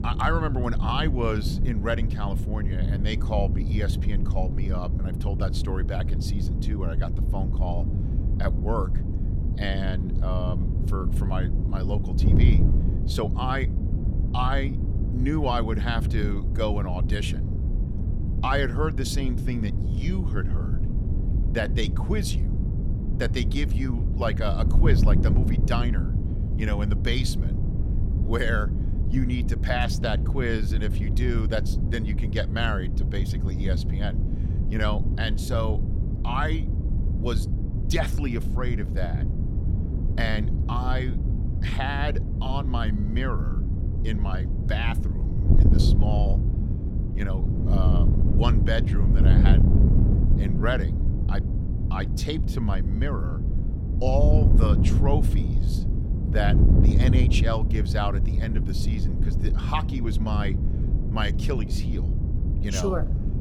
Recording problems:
wind noise on the microphone; heavy; 7 dB below the speech

